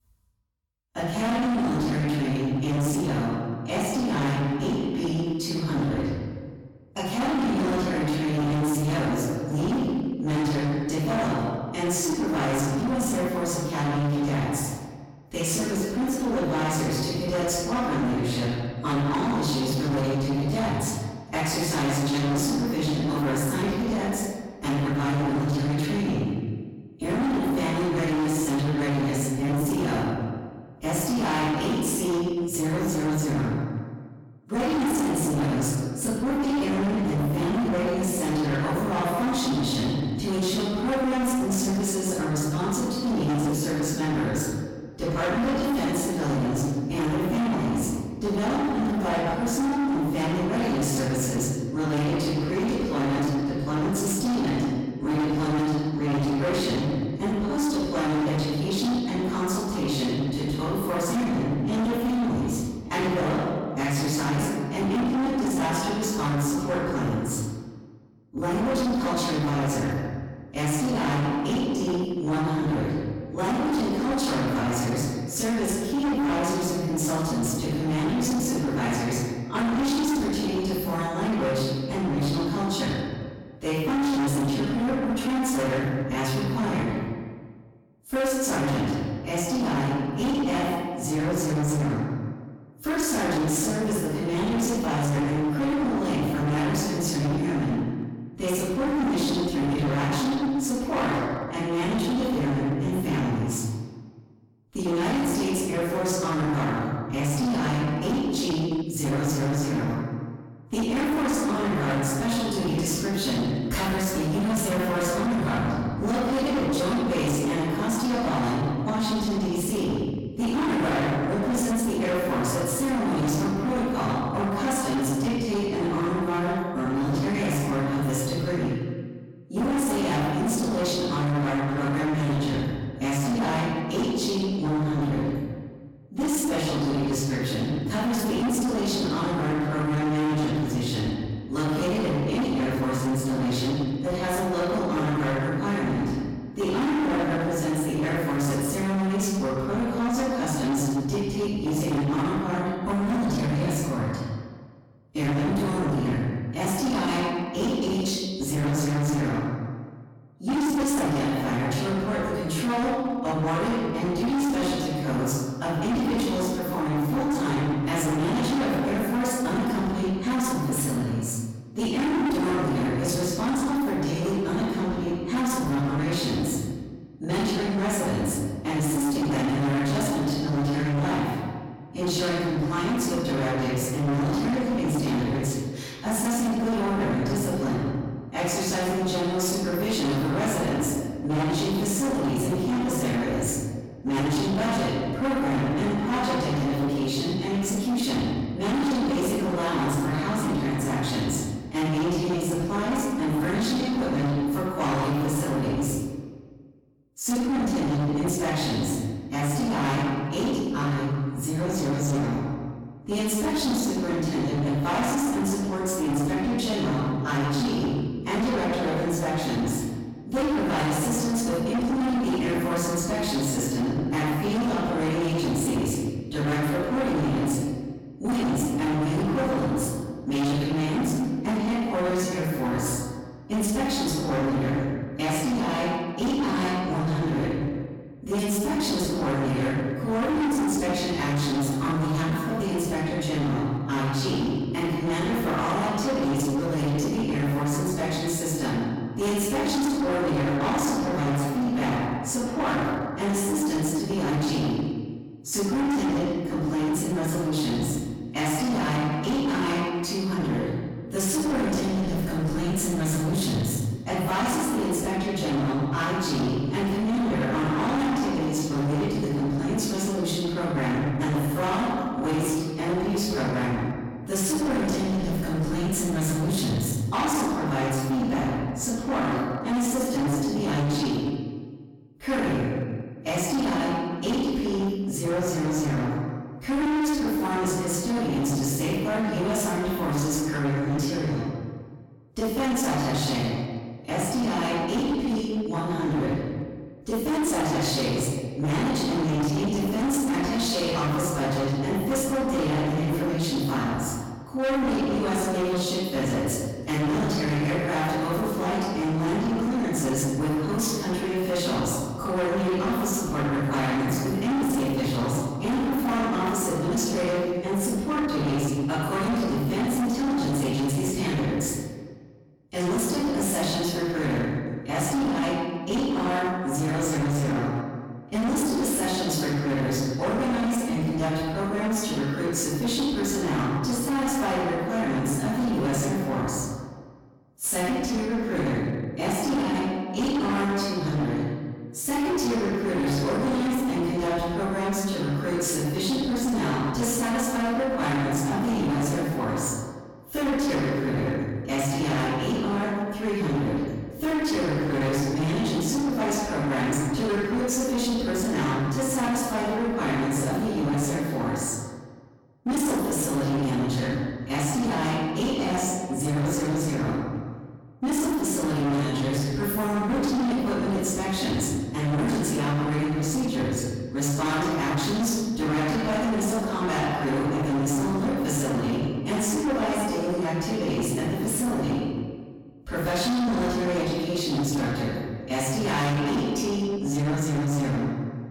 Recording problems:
distortion; heavy; 32% of the sound clipped
room echo; strong; dies away in 1.4 s
off-mic speech; far

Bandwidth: 17 kHz